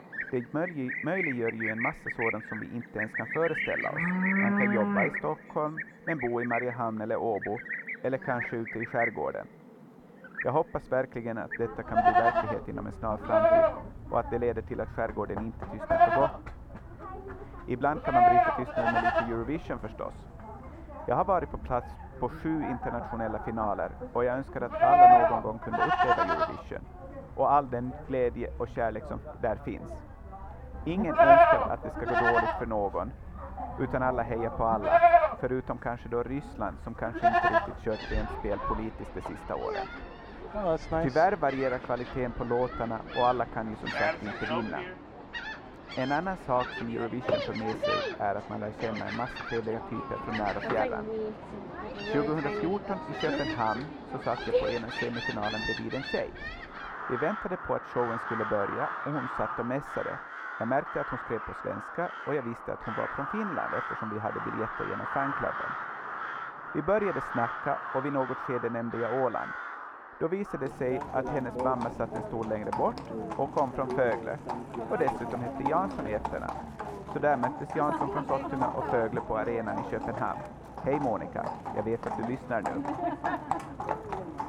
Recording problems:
muffled; very; fading above 2.5 kHz
animal sounds; very loud; throughout; 2 dB above the speech

